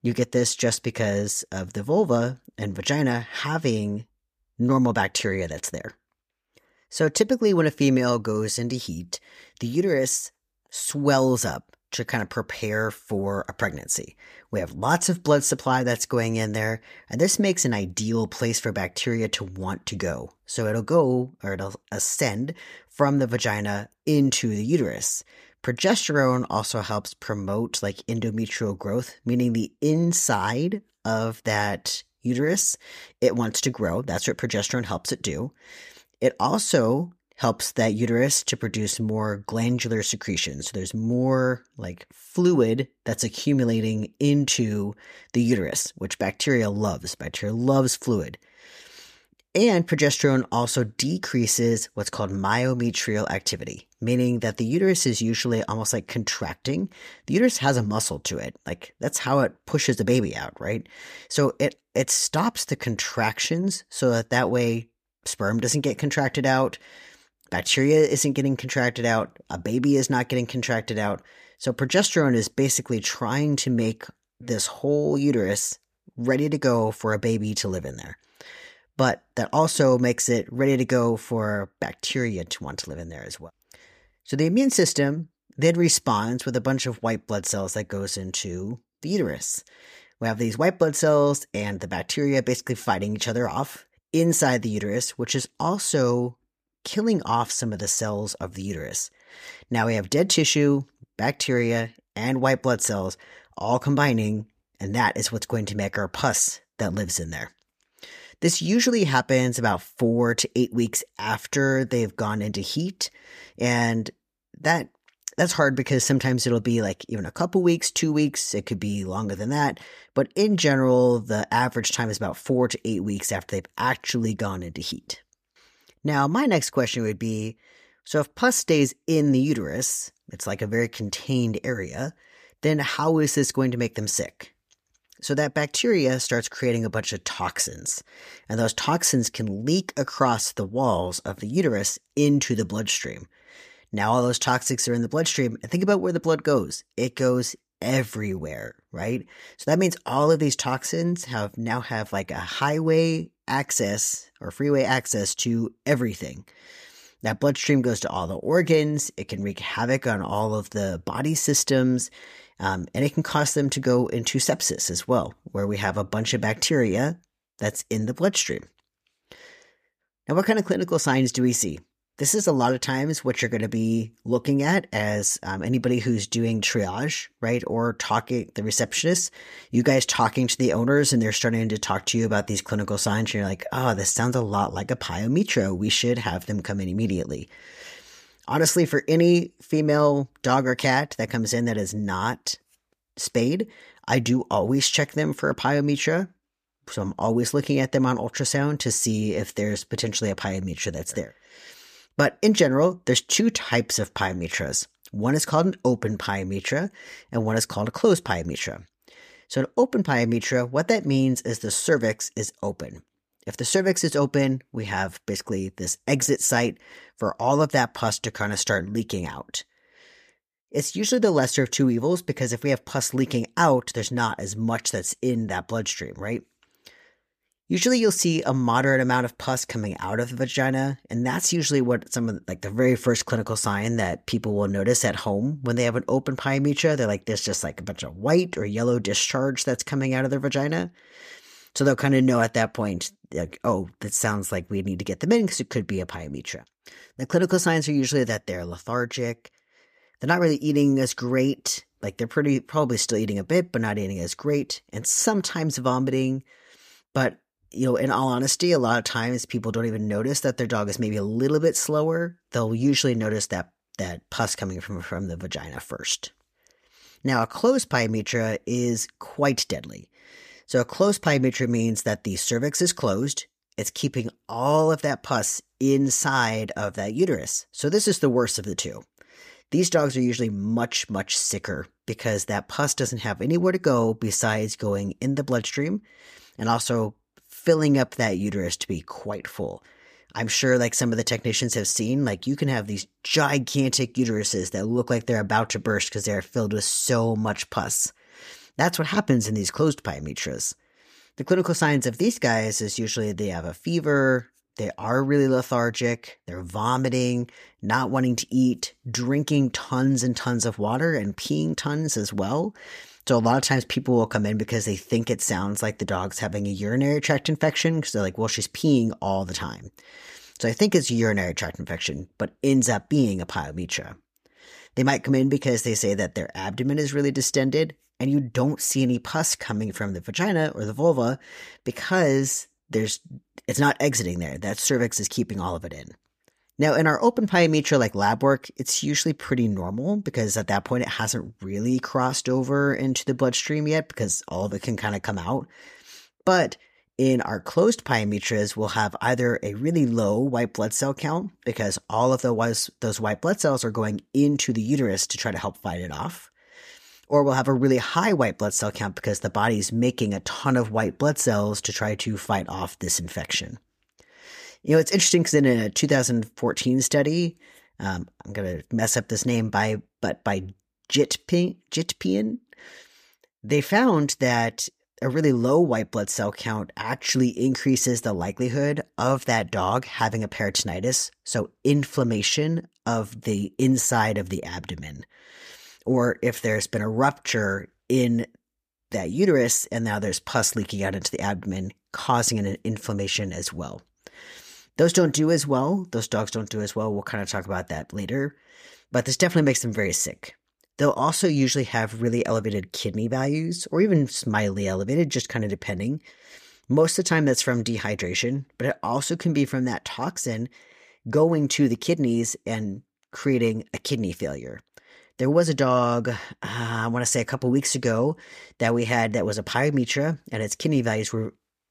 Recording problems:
none

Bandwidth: 14.5 kHz